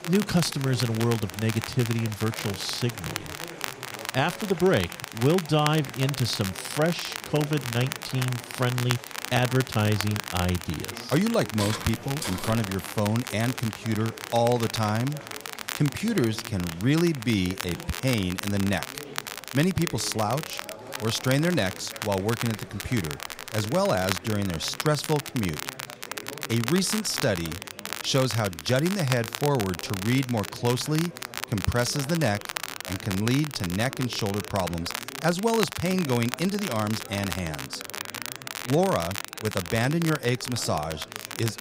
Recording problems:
crackle, like an old record; loud; 8 dB below the speech
chatter from many people; noticeable; throughout; 15 dB below the speech
footsteps; noticeable; from 12 to 13 s; peak 6 dB below the speech

